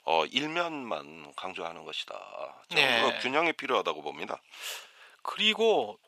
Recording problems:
thin; very; fading below 750 Hz

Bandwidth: 14.5 kHz